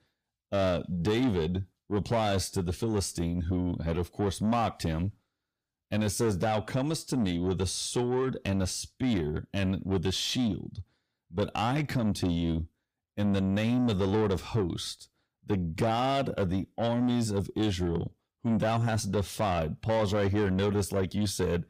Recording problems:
distortion; slight; 10 dB below the speech

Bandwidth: 15.5 kHz